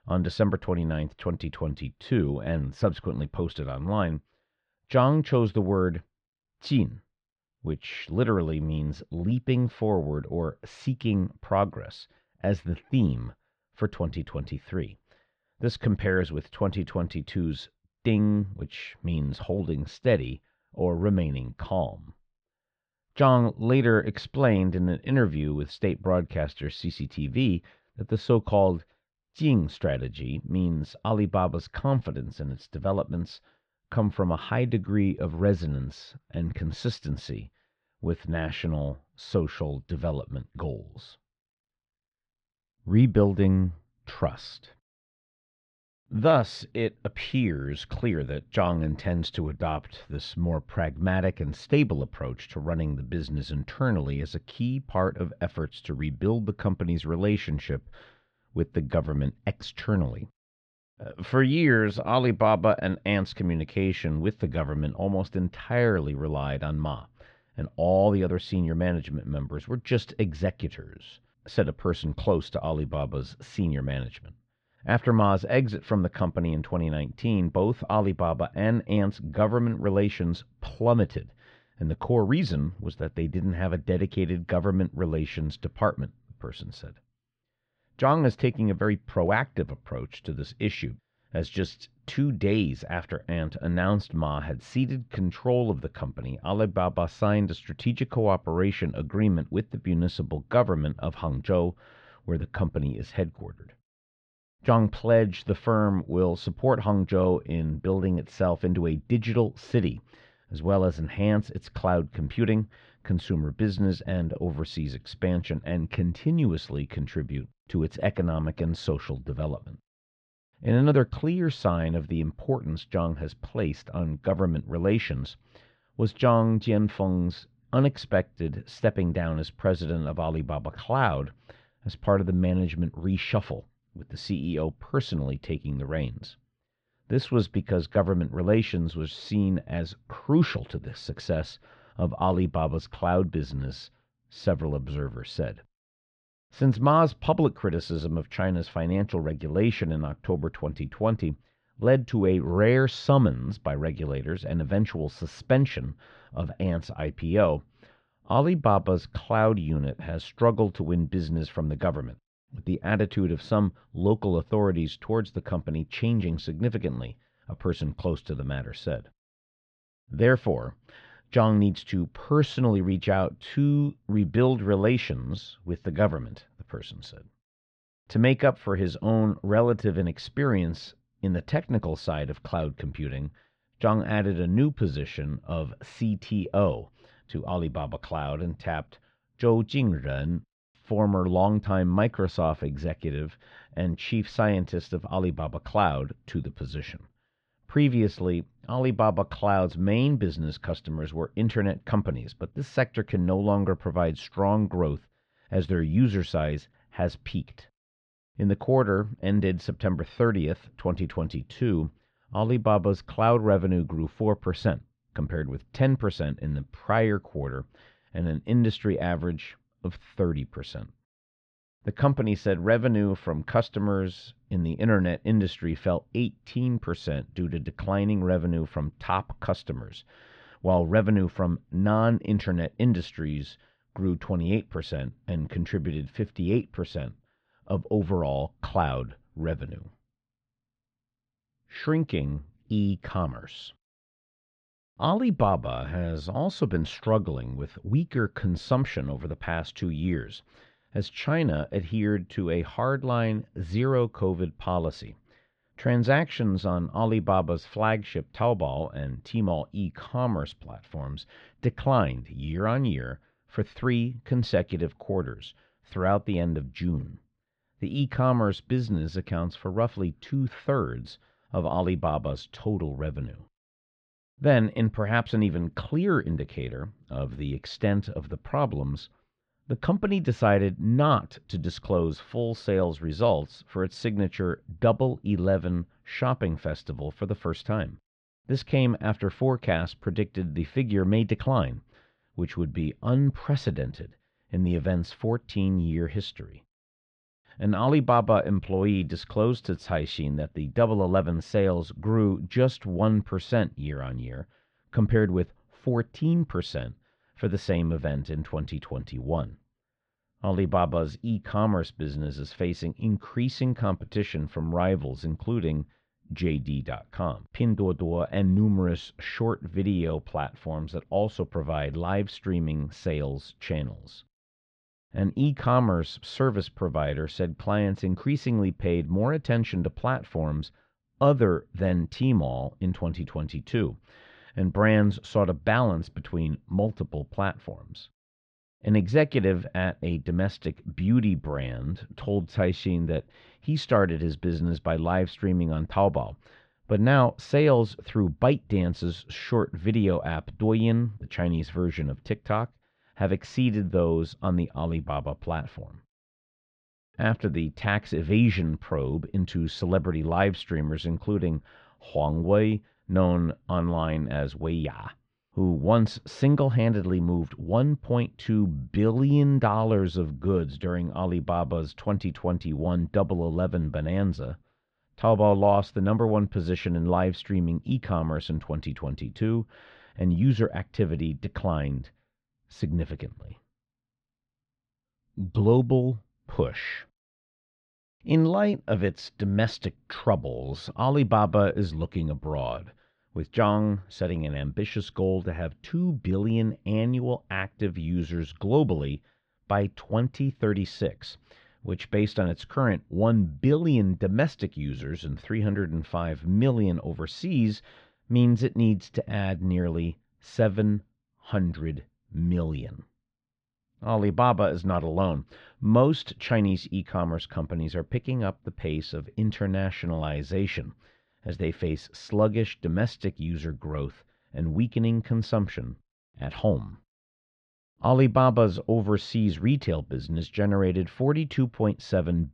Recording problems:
muffled; slightly; fading above 4 kHz

